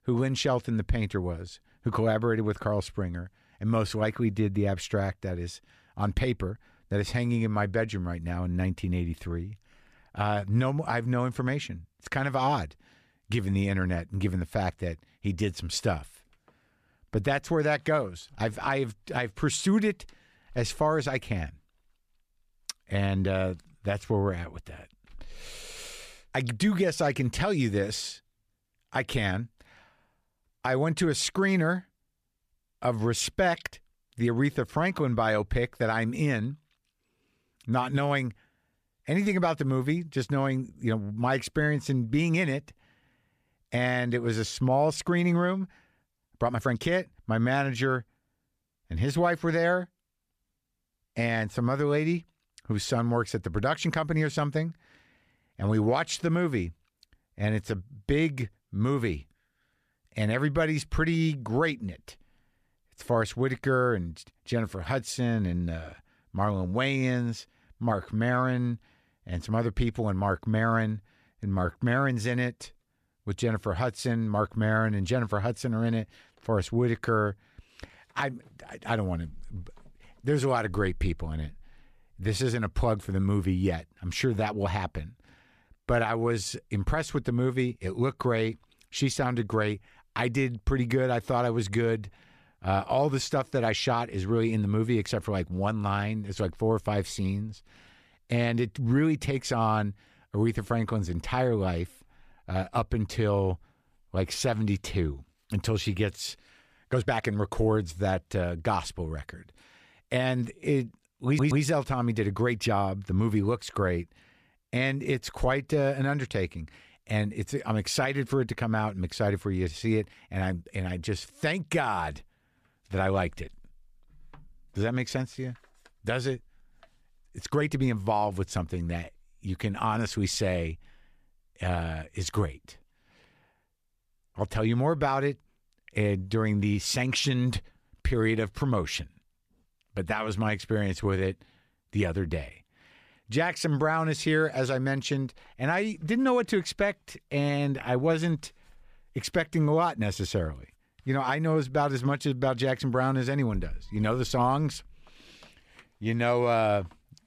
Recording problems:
uneven, jittery; strongly; from 46 s to 2:22
audio stuttering; at 1:51

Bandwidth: 14.5 kHz